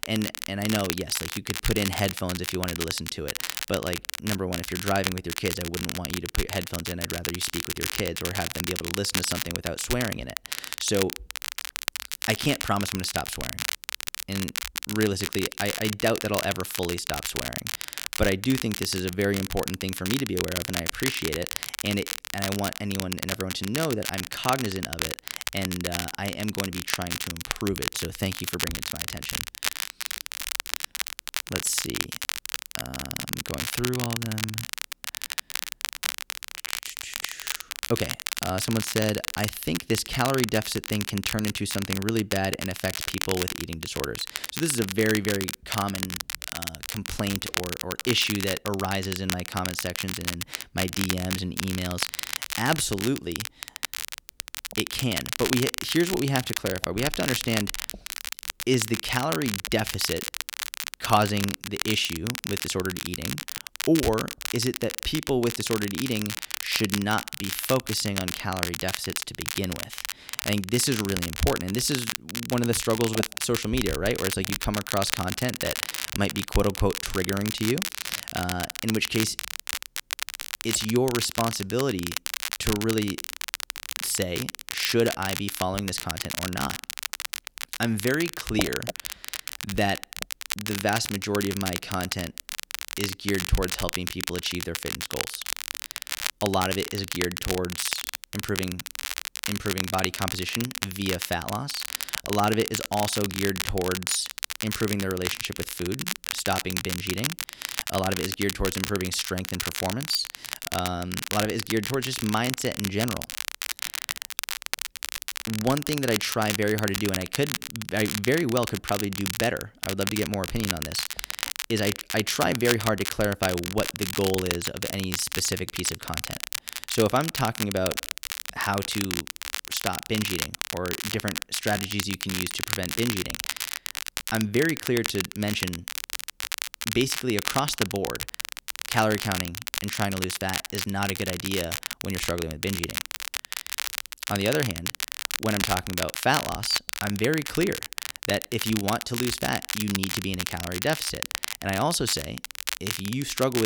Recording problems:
crackle, like an old record; loud; 3 dB below the speech
abrupt cut into speech; at the end

